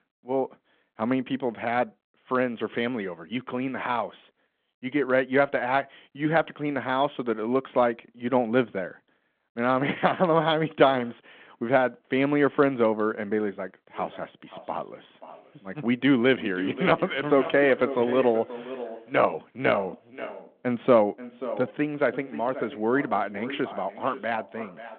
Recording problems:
echo of what is said; noticeable; from 14 s on; 530 ms later, 15 dB below the speech
phone-call audio

